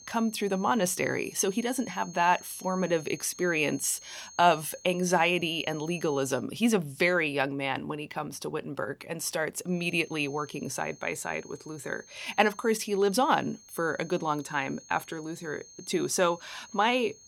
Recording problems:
high-pitched whine; noticeable; until 6.5 s and from 9.5 s on; 6.5 kHz, 20 dB below the speech

